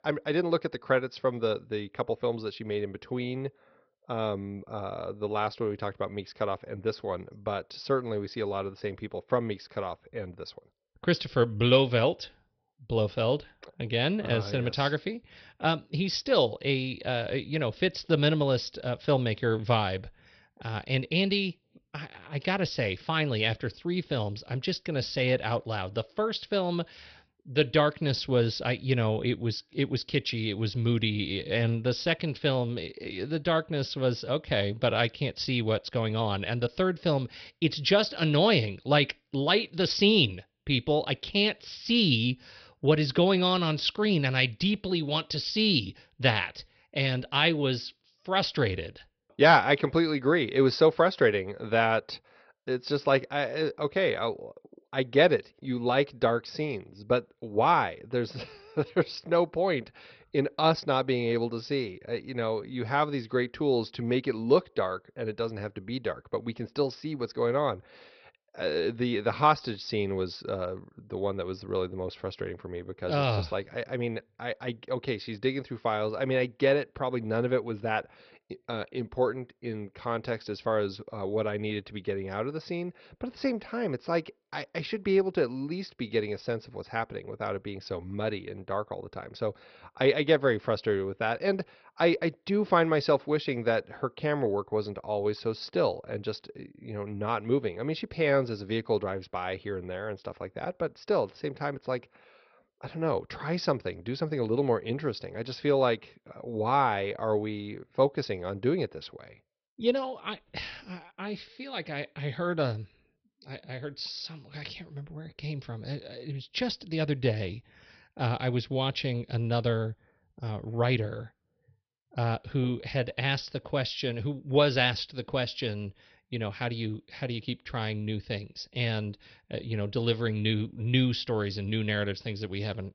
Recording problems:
garbled, watery; slightly; nothing above 5.5 kHz
high frequencies cut off; slight

